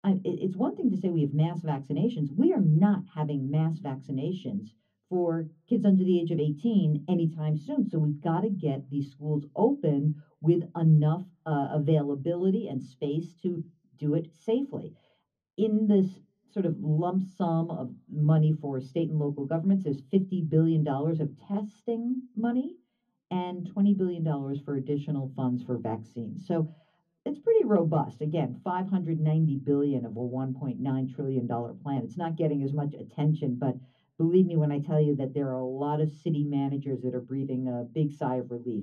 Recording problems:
off-mic speech; far
room echo; slight; dies away in 0.3 s

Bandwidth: 14 kHz